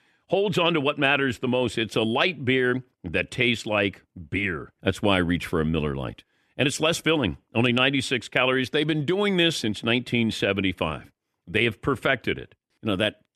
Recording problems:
none

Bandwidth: 13.5 kHz